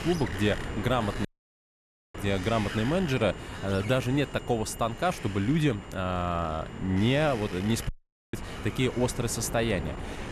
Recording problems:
wind noise on the microphone; heavy; 10 dB below the speech
high-pitched whine; faint; throughout; 3 kHz, 25 dB below the speech
audio cutting out; at 1.5 s for 1 s and at 8 s

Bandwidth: 13.5 kHz